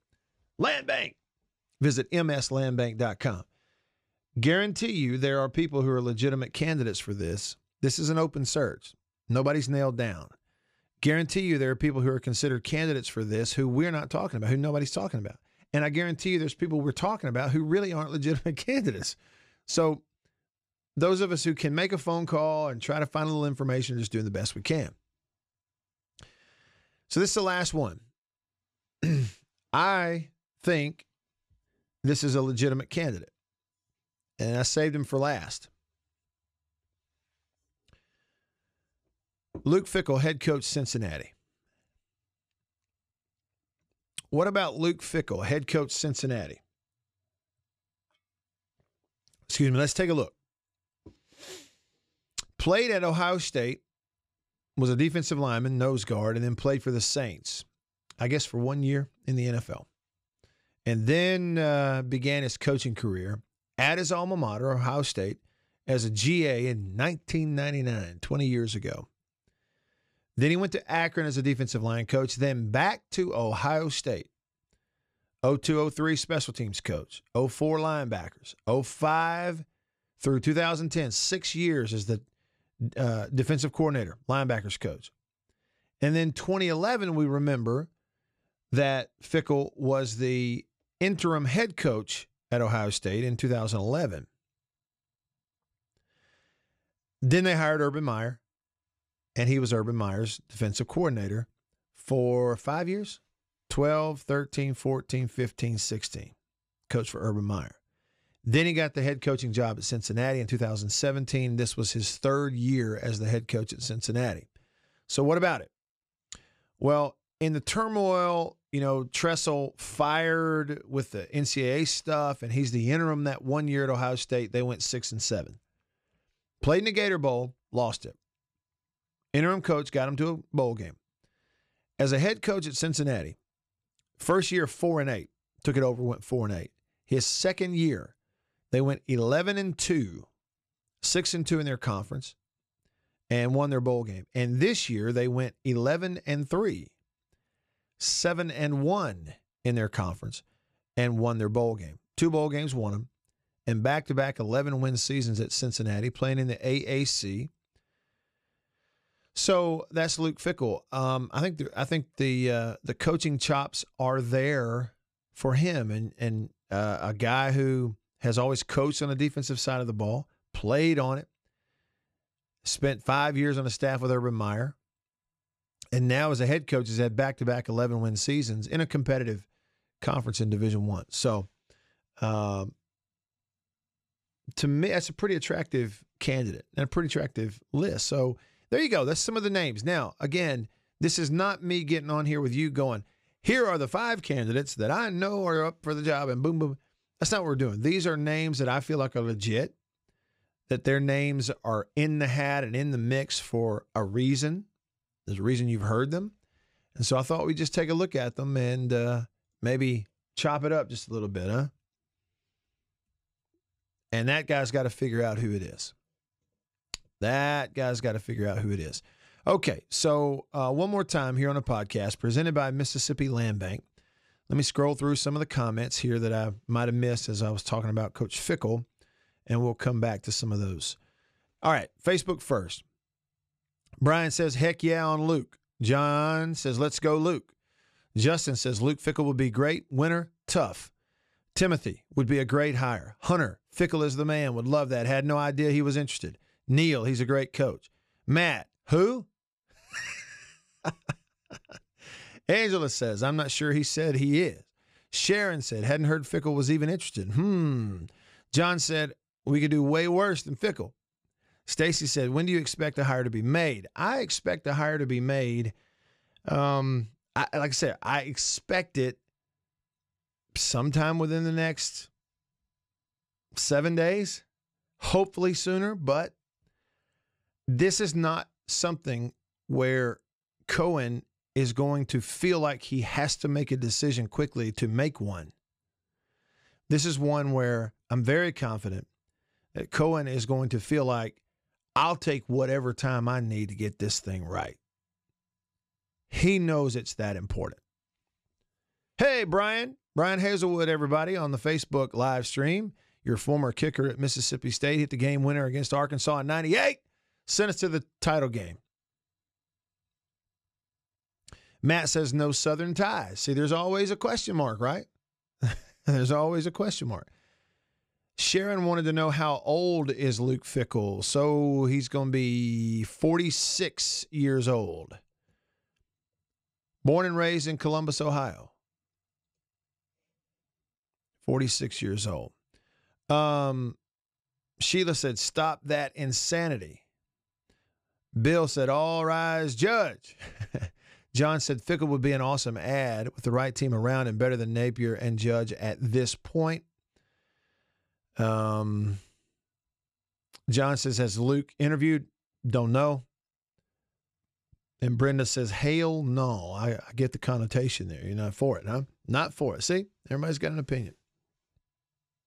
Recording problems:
none

